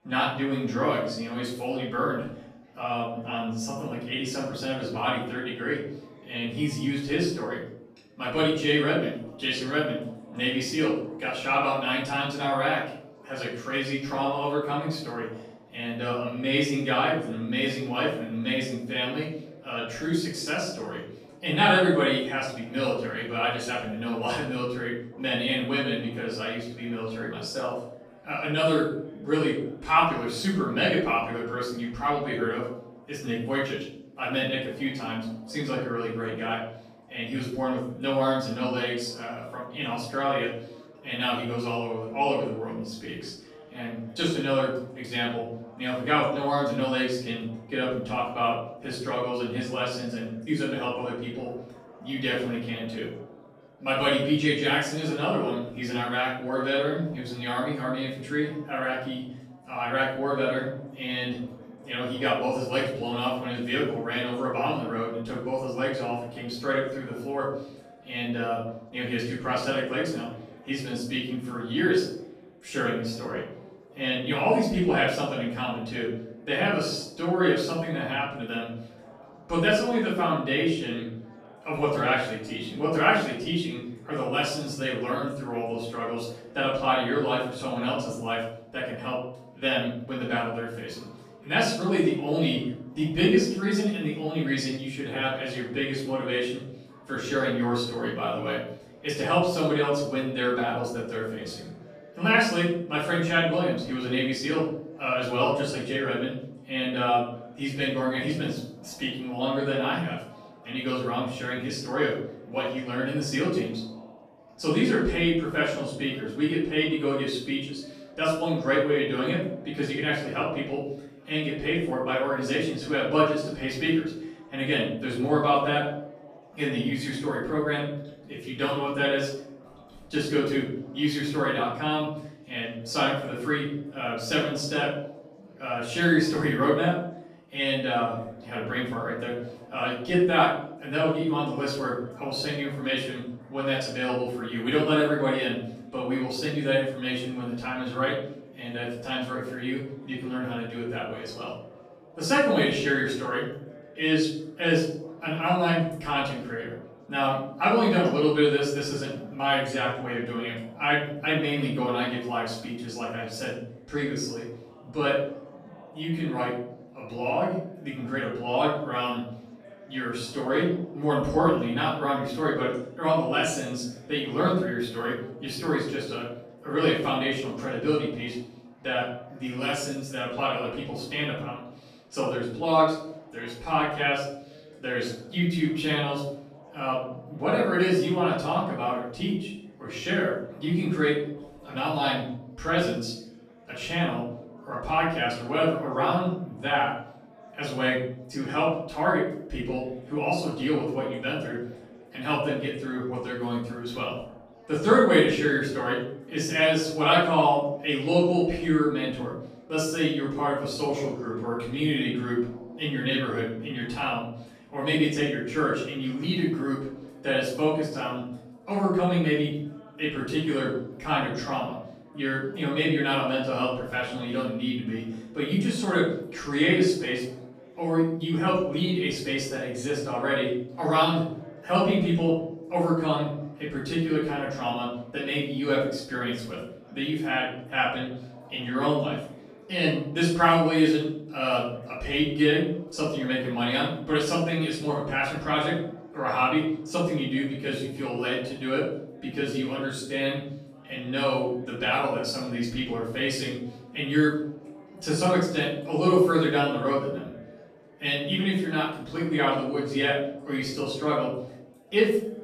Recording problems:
off-mic speech; far
room echo; noticeable; dies away in 0.6 s
chatter from many people; faint; throughout; 25 dB below the speech

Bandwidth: 14 kHz